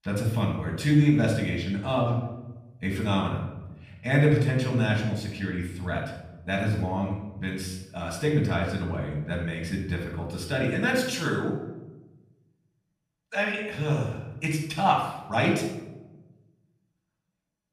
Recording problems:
off-mic speech; far
room echo; noticeable; dies away in 0.8 s

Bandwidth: 15 kHz